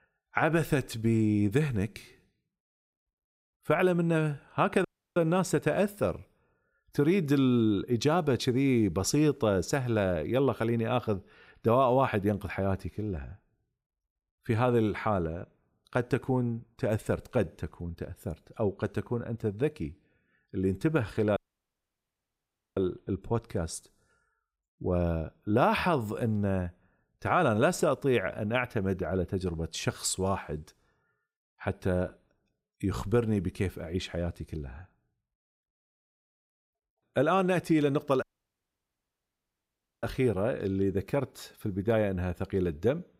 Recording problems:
audio cutting out; at 5 s, at 21 s for 1.5 s and at 38 s for 2 s

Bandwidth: 15.5 kHz